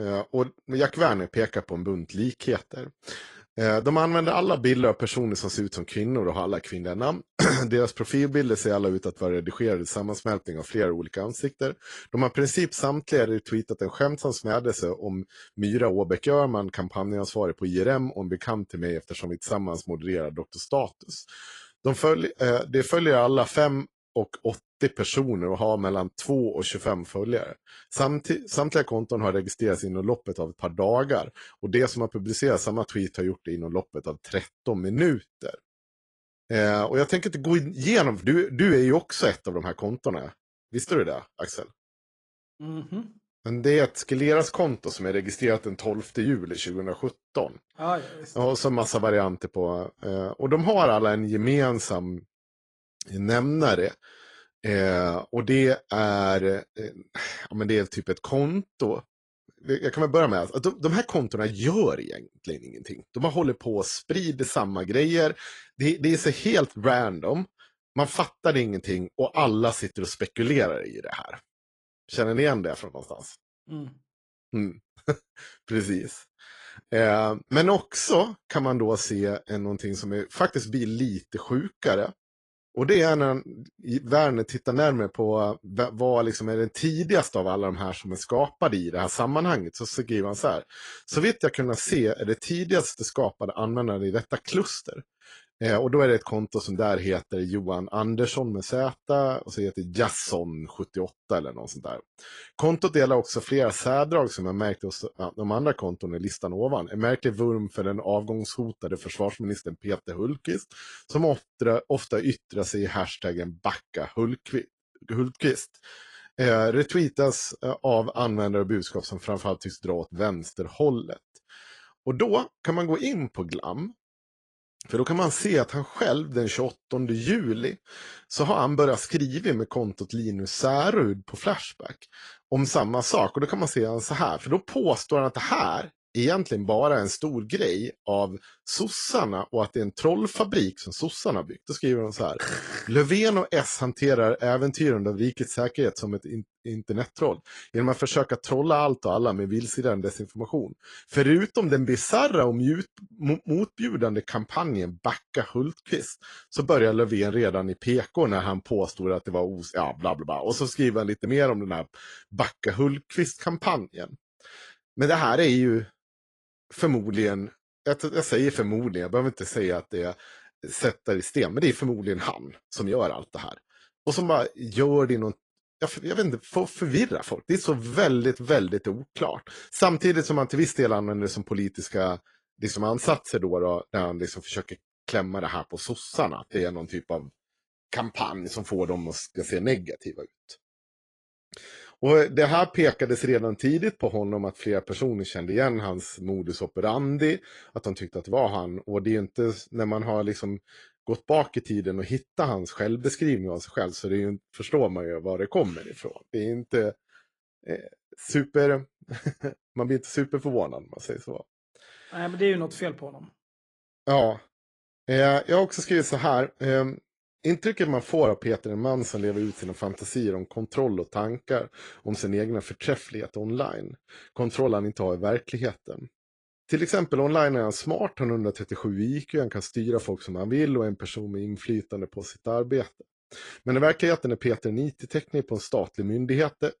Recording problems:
garbled, watery; slightly; nothing above 10 kHz
abrupt cut into speech; at the start

